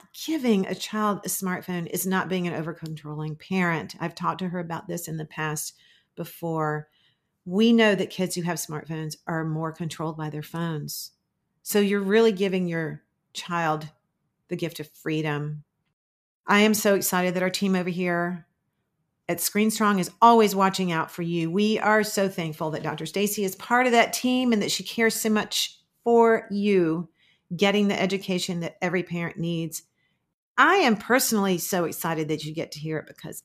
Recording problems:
none

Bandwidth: 14.5 kHz